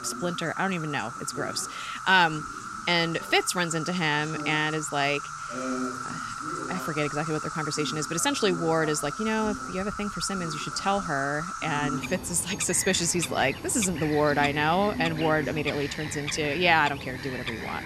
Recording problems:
animal sounds; loud; throughout; 8 dB below the speech
voice in the background; noticeable; throughout; 15 dB below the speech

